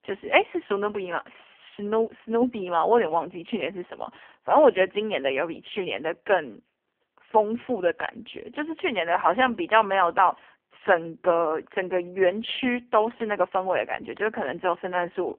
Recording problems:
phone-call audio; poor line; nothing above 3.5 kHz

